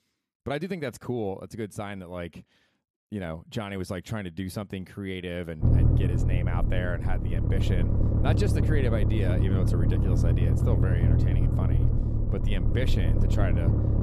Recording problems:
low rumble; loud; from 5.5 s on; 1 dB below the speech

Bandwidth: 15 kHz